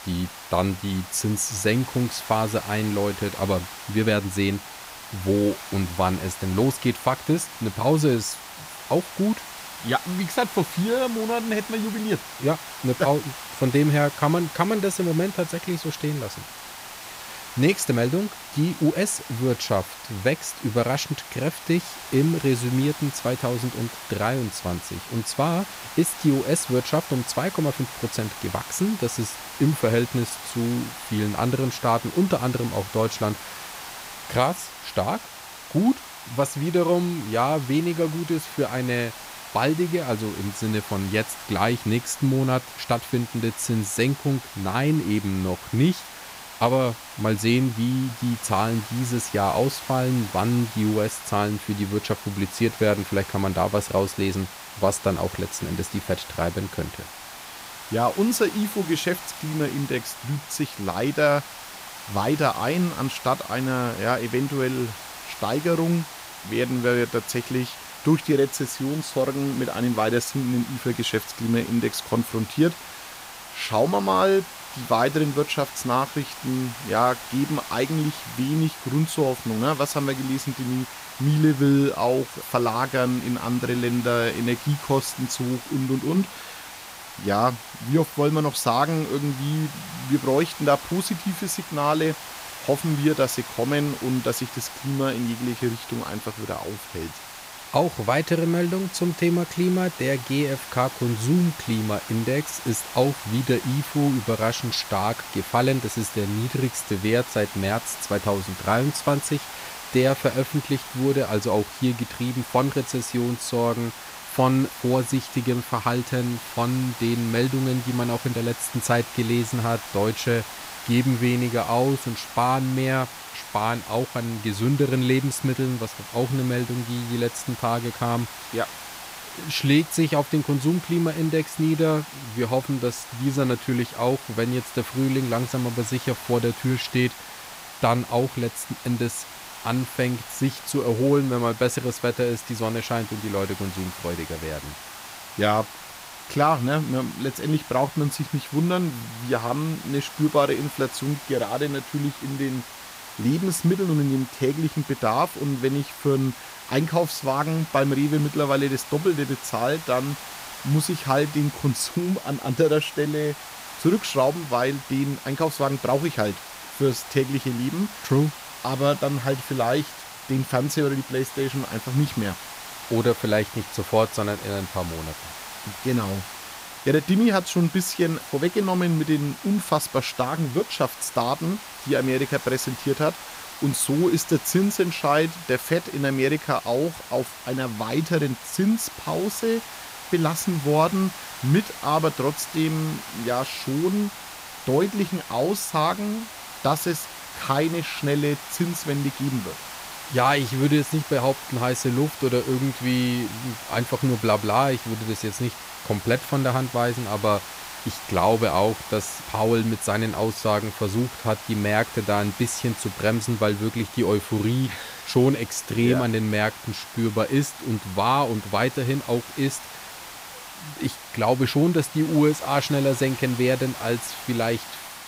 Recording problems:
hiss; noticeable; throughout; 10 dB below the speech

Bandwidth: 15.5 kHz